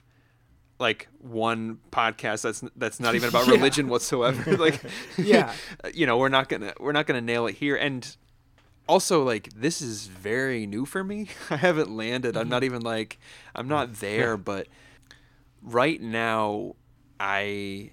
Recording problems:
none

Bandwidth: 17.5 kHz